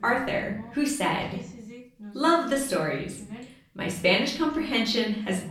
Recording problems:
off-mic speech; far
room echo; slight; dies away in 0.6 s
voice in the background; noticeable; throughout; 20 dB below the speech

